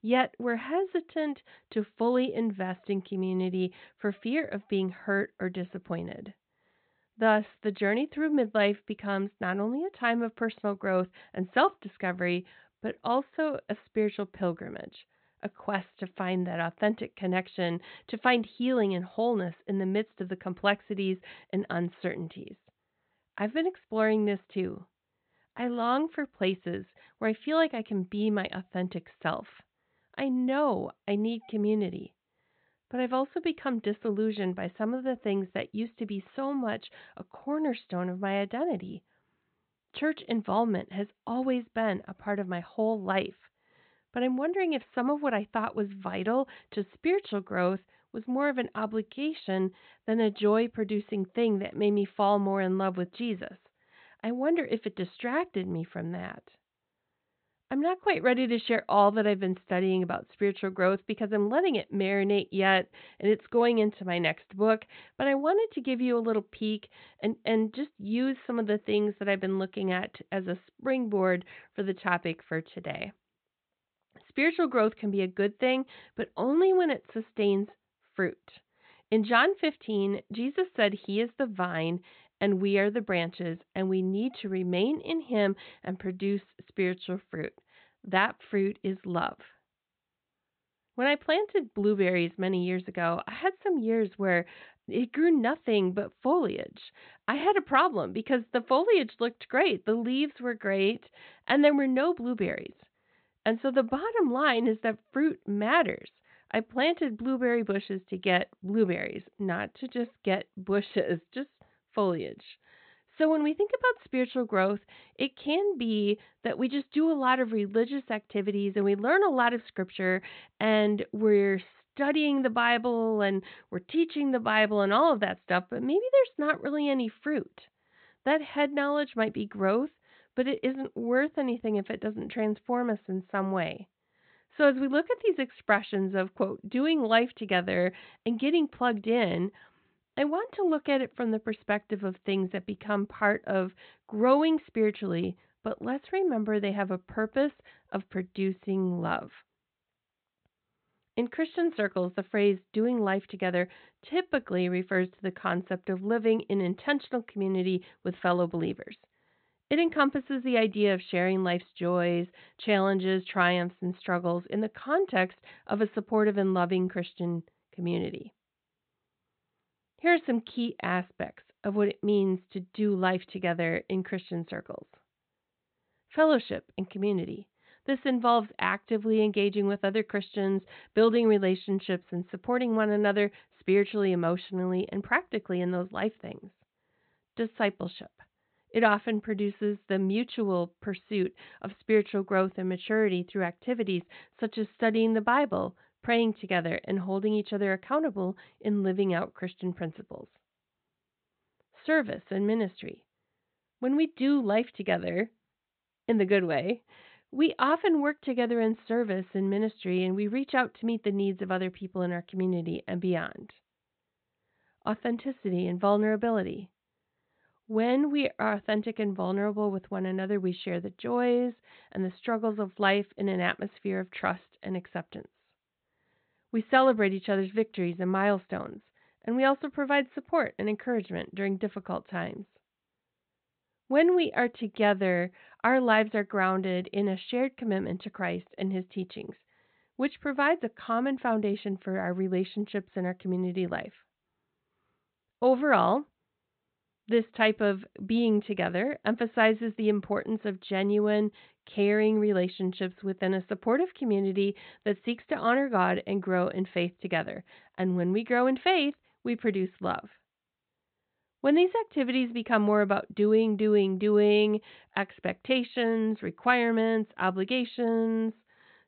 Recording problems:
high frequencies cut off; severe; nothing above 4 kHz

